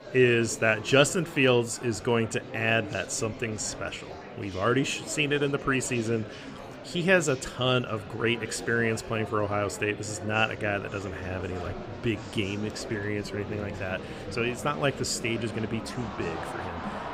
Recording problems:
murmuring crowd; noticeable; throughout; 10 dB below the speech

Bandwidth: 15.5 kHz